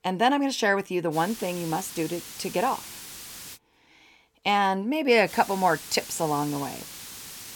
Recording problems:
hiss; noticeable; from 1 to 3.5 s and from 5.5 s on; 15 dB below the speech

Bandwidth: 17.5 kHz